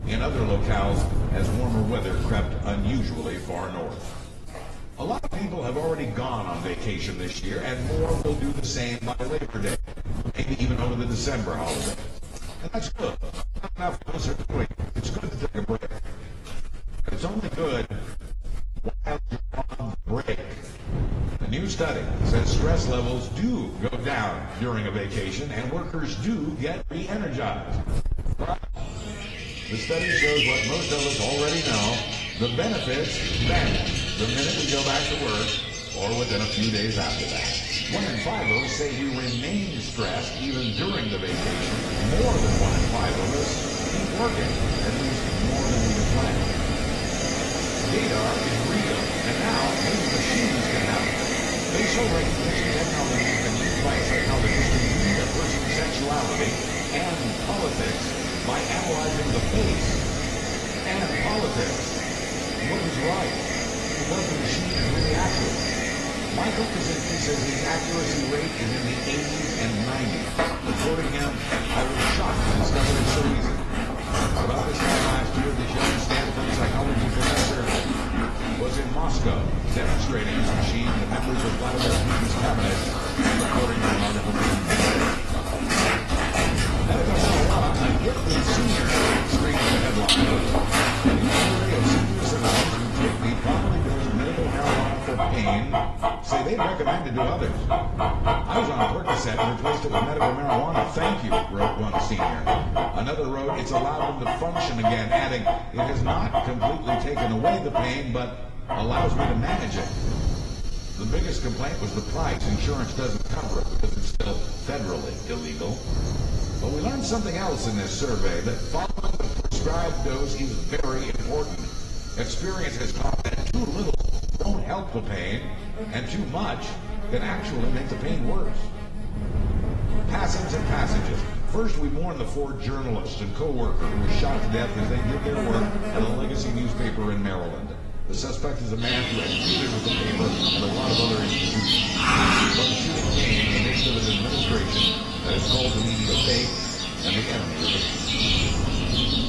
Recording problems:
room echo; slight; dies away in 1.6 s
distortion; slight; 6% of the sound clipped
off-mic speech; somewhat distant
garbled, watery; slightly
animal sounds; very loud; throughout; 3 dB above the speech
wind noise on the microphone; occasional gusts; 10 dB below the speech

